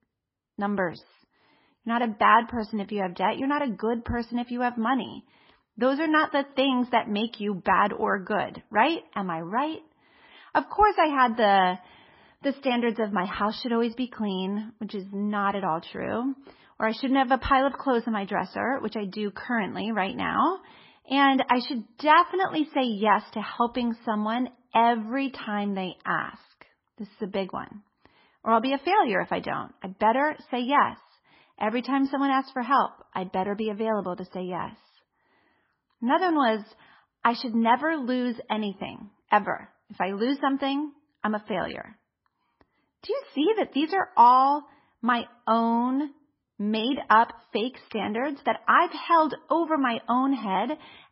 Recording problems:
garbled, watery; badly; nothing above 5.5 kHz

